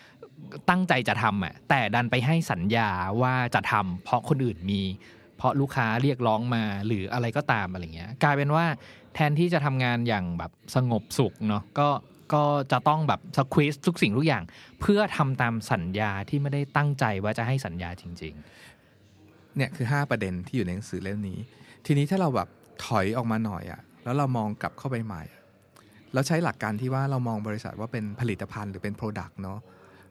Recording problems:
background chatter; faint; throughout; 4 voices, 30 dB below the speech

